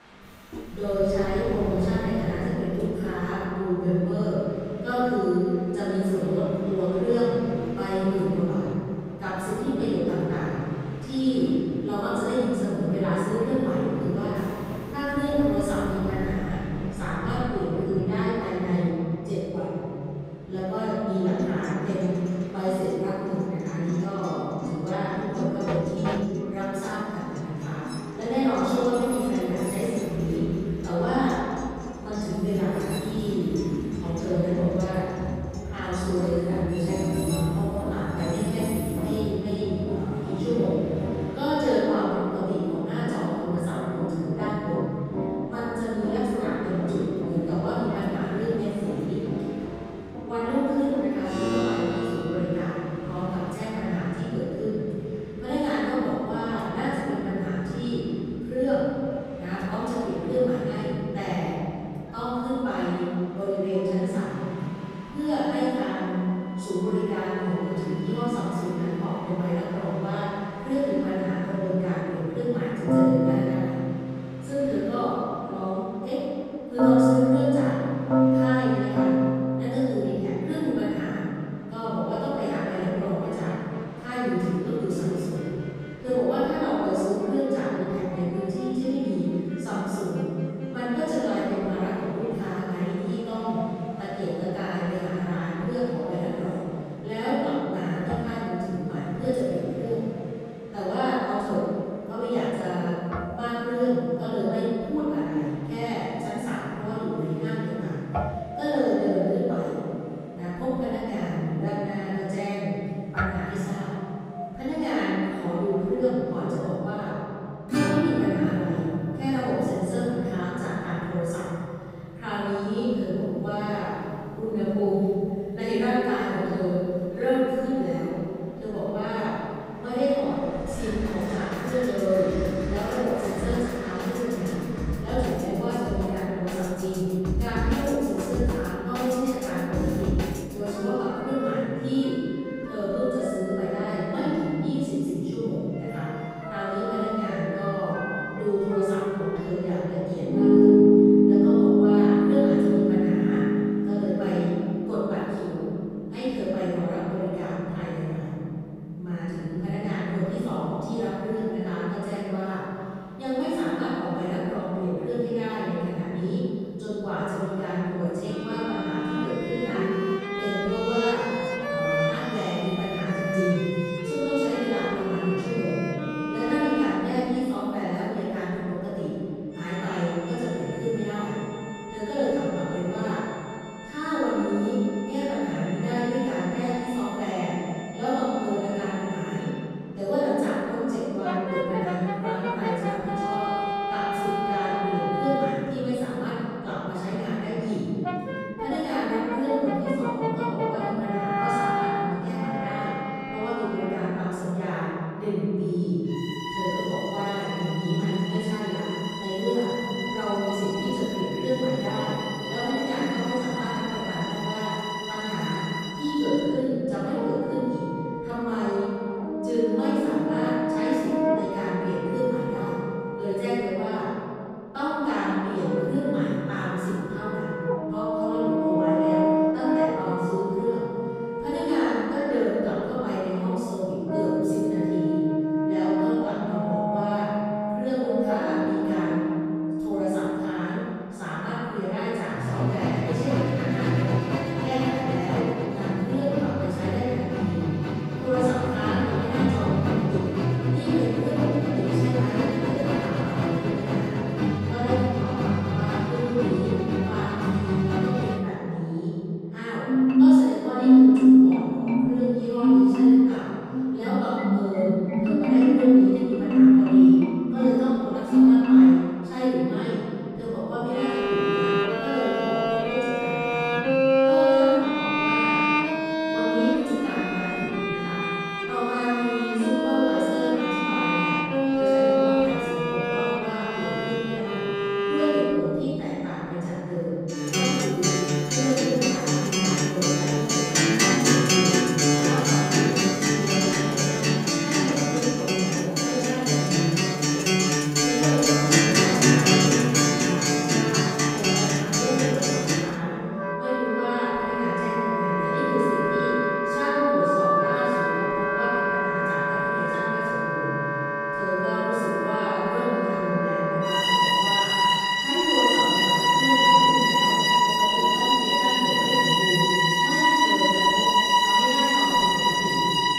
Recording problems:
room echo; strong; dies away in 2.5 s
off-mic speech; far
background music; very loud; throughout; 4 dB above the speech
train or aircraft noise; very faint; throughout; 15 dB below the speech

